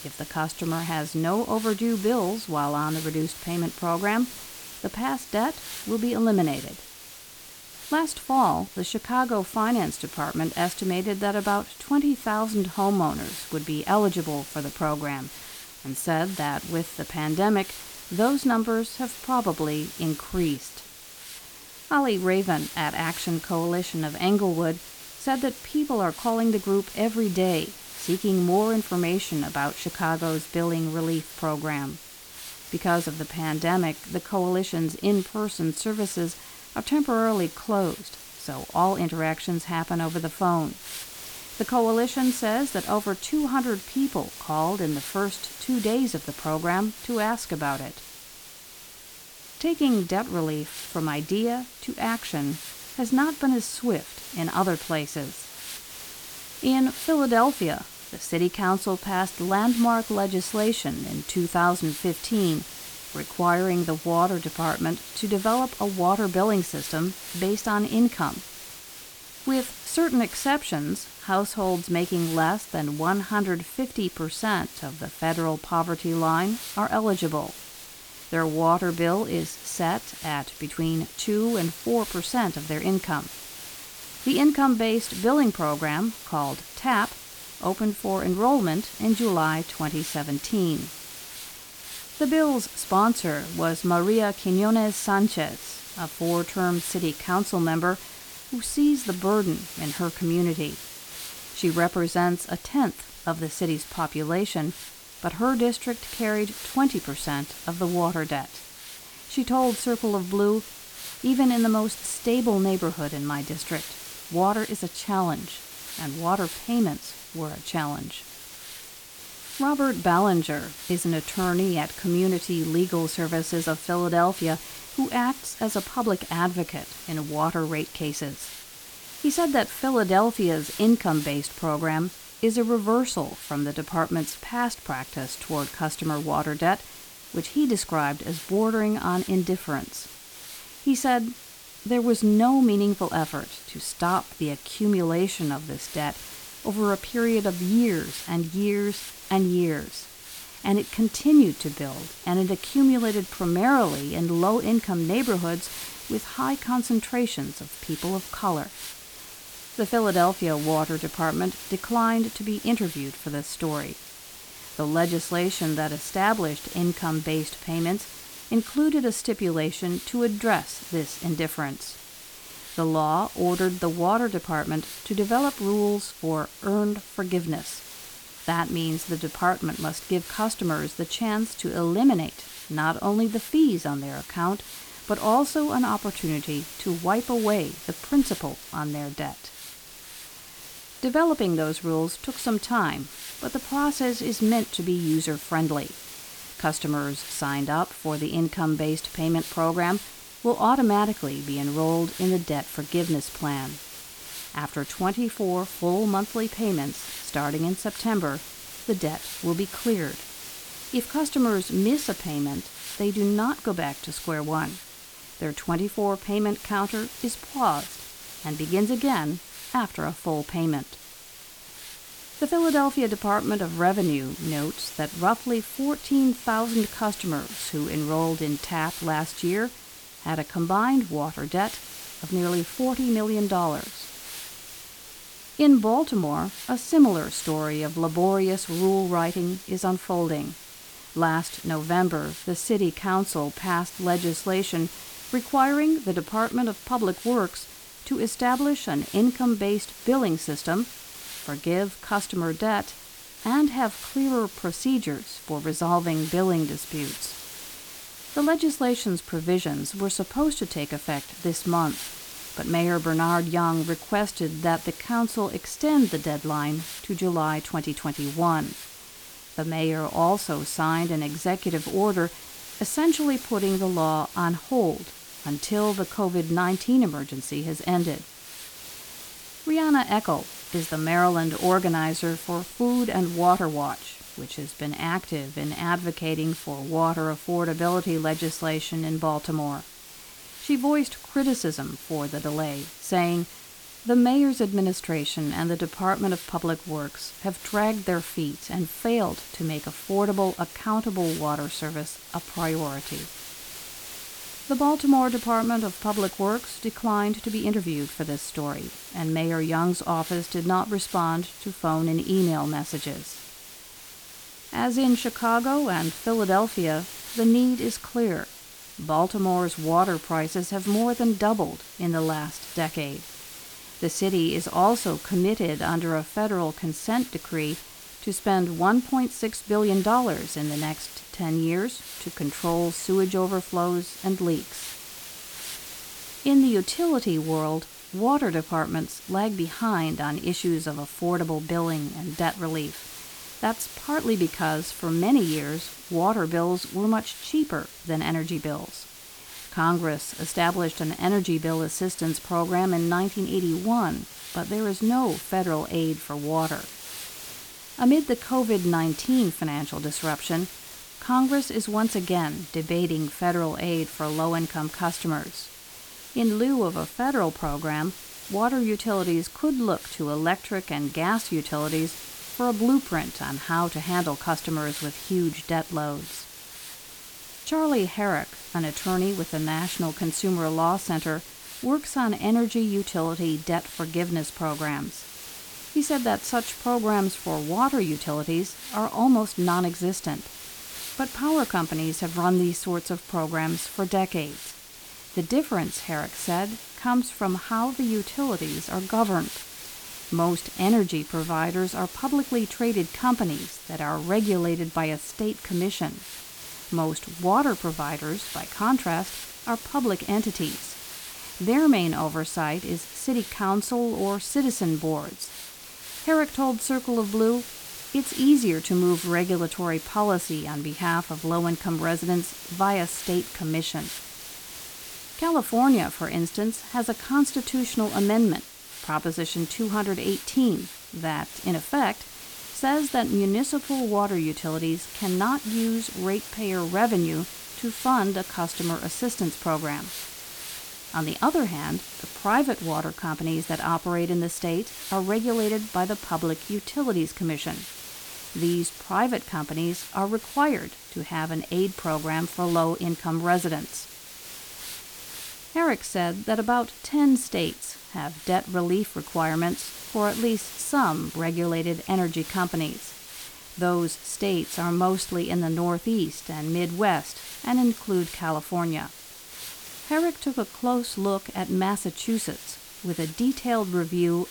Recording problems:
hiss; noticeable; throughout; 10 dB below the speech

